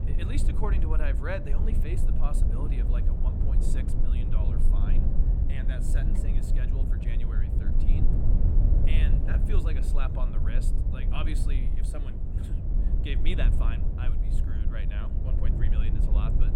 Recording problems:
low rumble; loud; throughout; 2 dB below the speech

